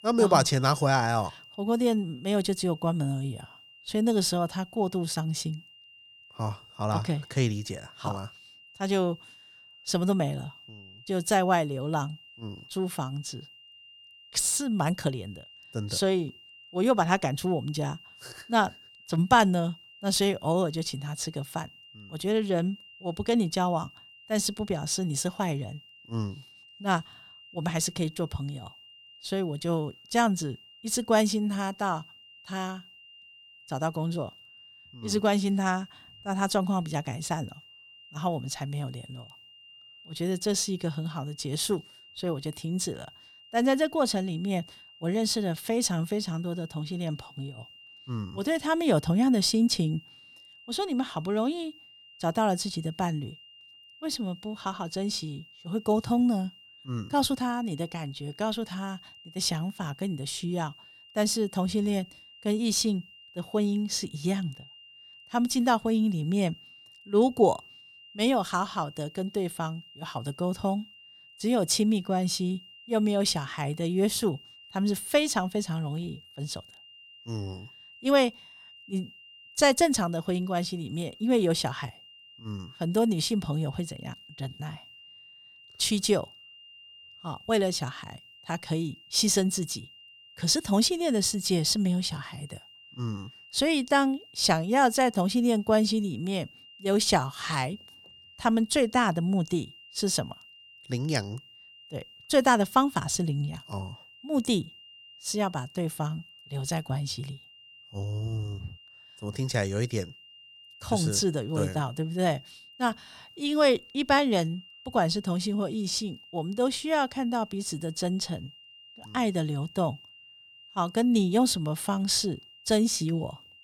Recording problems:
high-pitched whine; faint; throughout; 3 kHz, 20 dB below the speech

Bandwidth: 17.5 kHz